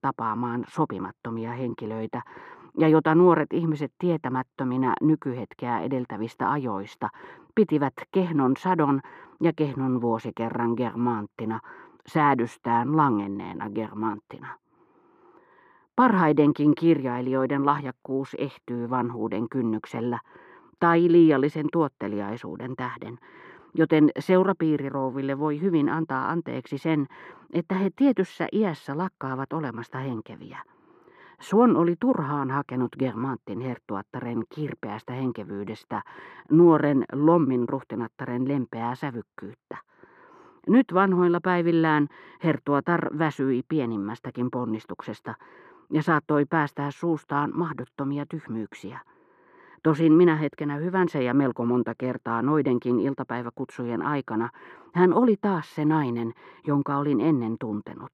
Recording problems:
muffled; very; fading above 3.5 kHz

